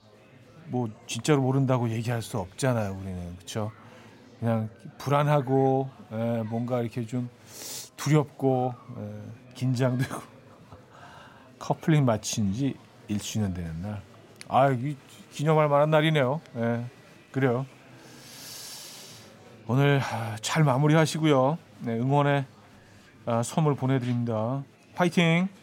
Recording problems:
murmuring crowd; faint; throughout; 25 dB below the speech

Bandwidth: 16 kHz